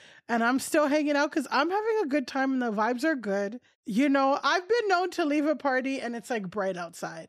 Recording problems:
none

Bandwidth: 15.5 kHz